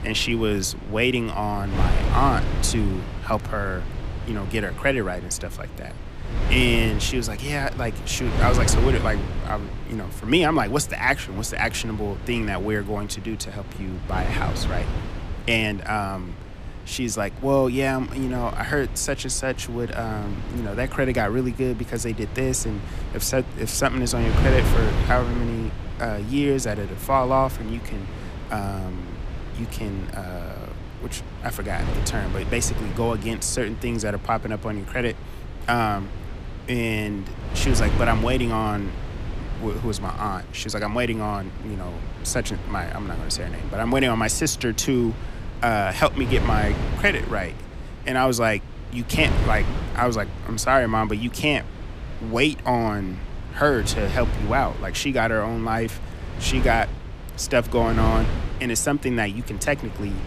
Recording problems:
wind noise on the microphone; occasional gusts; 10 dB below the speech

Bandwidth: 14.5 kHz